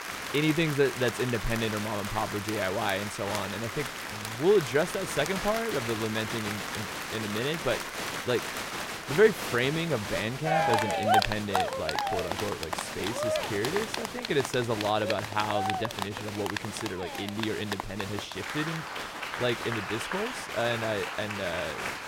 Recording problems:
crowd noise; loud; throughout; 2 dB below the speech

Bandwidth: 16 kHz